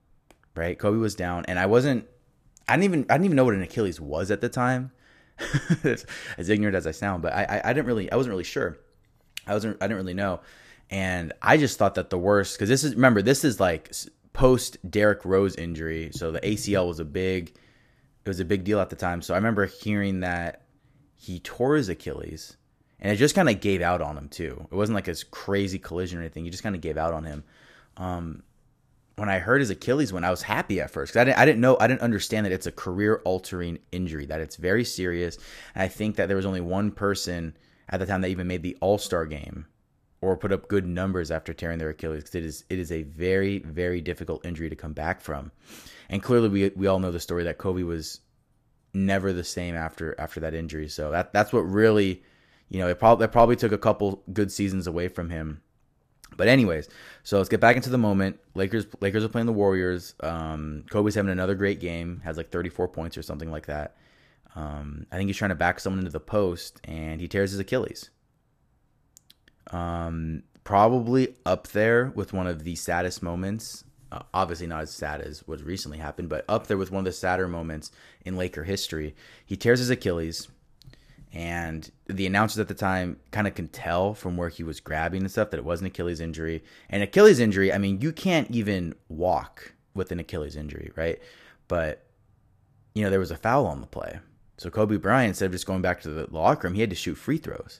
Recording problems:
none

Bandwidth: 14.5 kHz